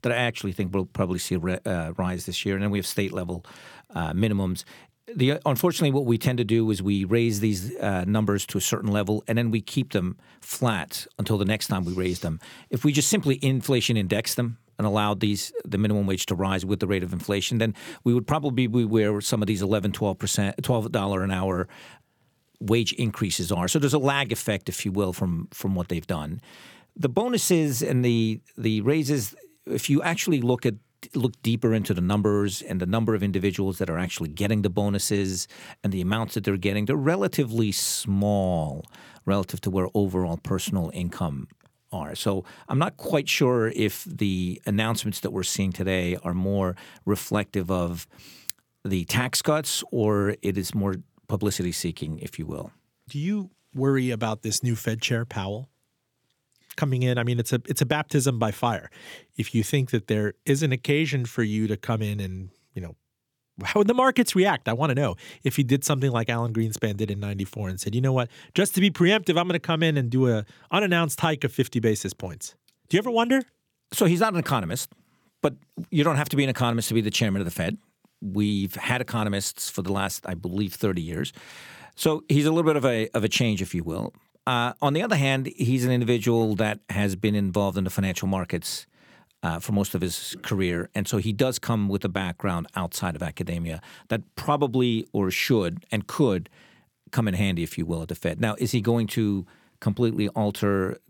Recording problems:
none

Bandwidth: 18.5 kHz